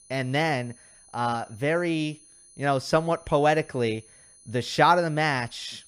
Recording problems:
high-pitched whine; faint; throughout; 10 kHz, 25 dB below the speech

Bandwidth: 14.5 kHz